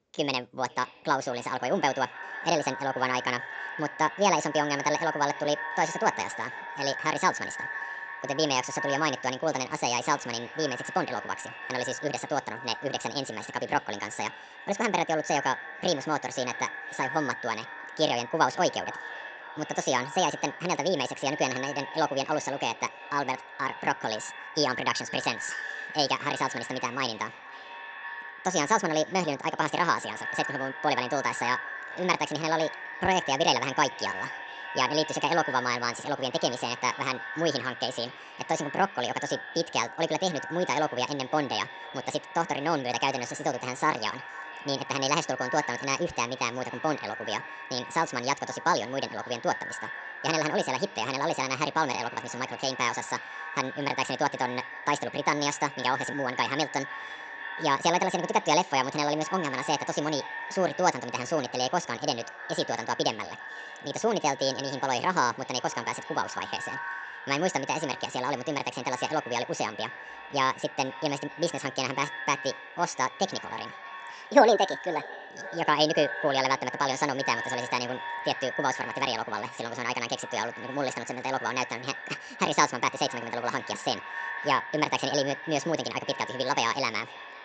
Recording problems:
echo of what is said; strong; throughout; 500 ms later, 10 dB below the speech
wrong speed and pitch; too fast and too high; 1.6 times normal speed
high frequencies cut off; noticeable; nothing above 8 kHz

